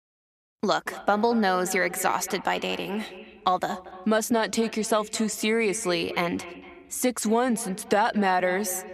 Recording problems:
echo of what is said; noticeable; throughout; 230 ms later, 15 dB below the speech

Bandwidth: 14 kHz